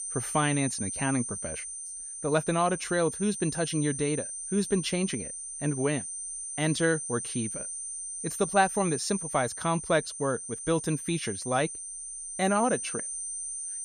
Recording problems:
high-pitched whine; loud; throughout; 9 kHz, 5 dB below the speech

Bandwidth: 15.5 kHz